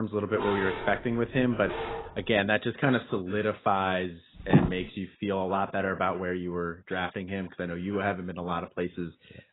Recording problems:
garbled, watery; badly; nothing above 4 kHz
abrupt cut into speech; at the start
dog barking; noticeable; until 2.5 s; peak 3 dB below the speech
footsteps; loud; at 4.5 s; peak 5 dB above the speech

